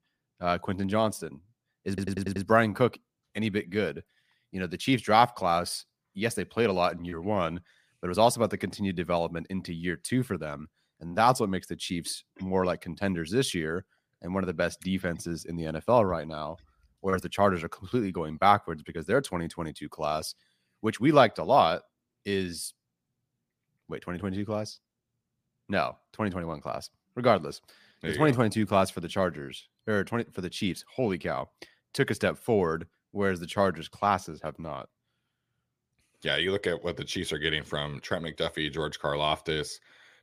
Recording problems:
audio stuttering; at 2 s

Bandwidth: 15 kHz